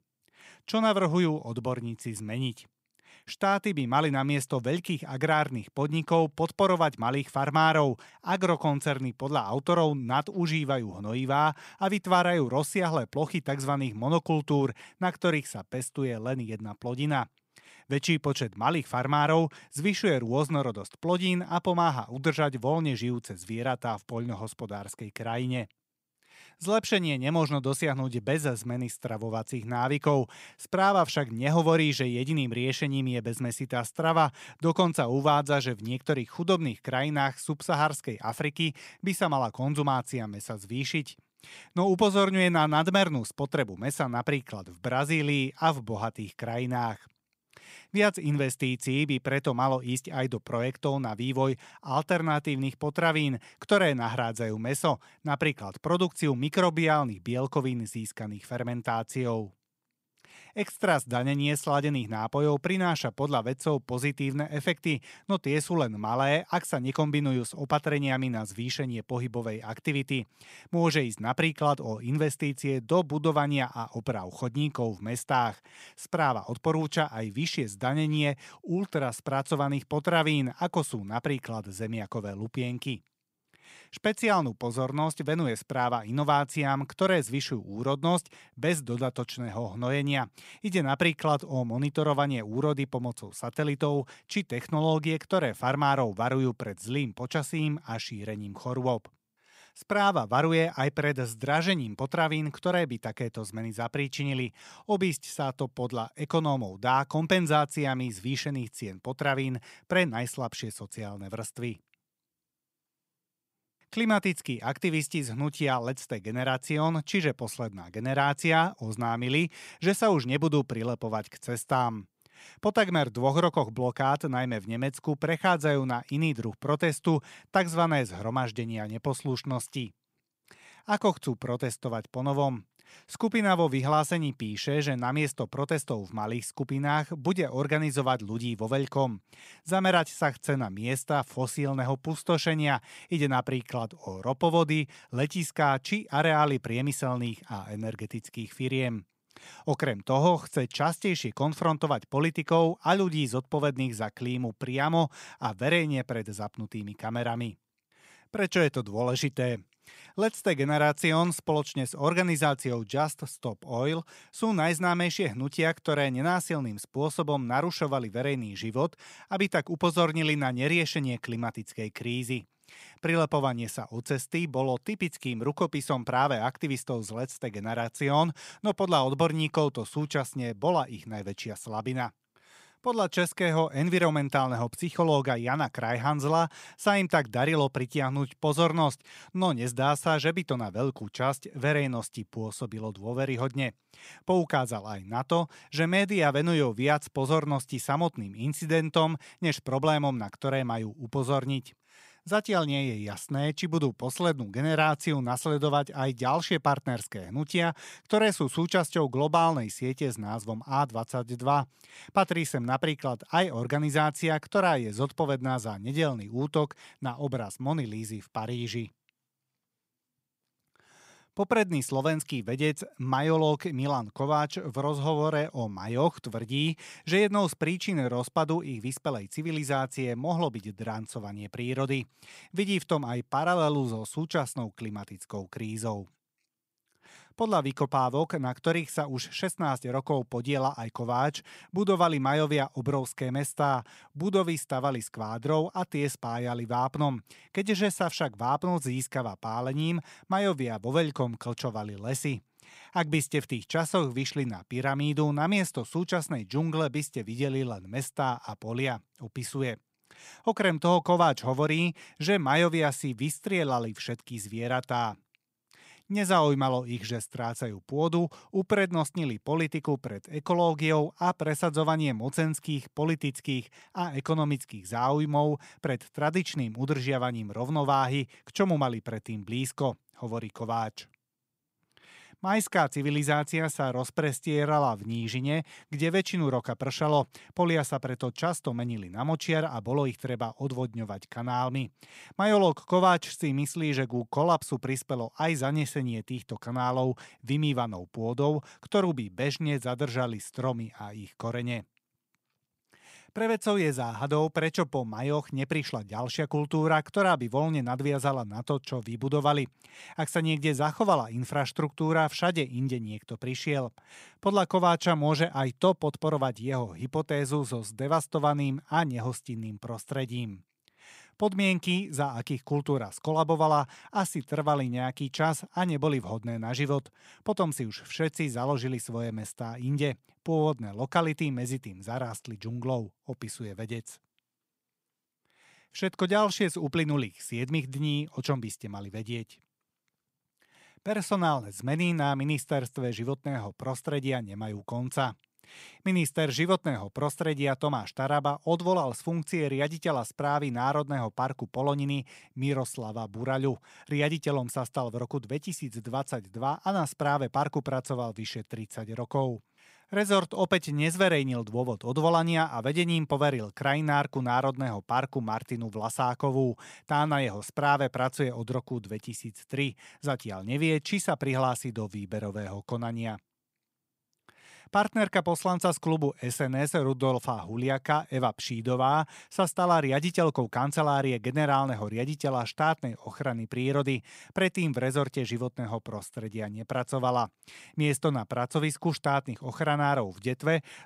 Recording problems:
none

